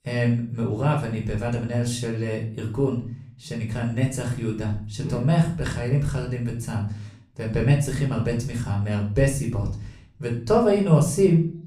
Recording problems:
off-mic speech; far
room echo; slight; dies away in 0.4 s

